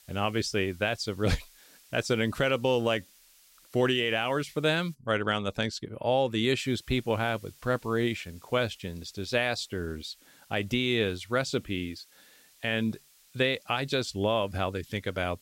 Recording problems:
hiss; faint; until 5 s and from 6.5 s on; 25 dB below the speech

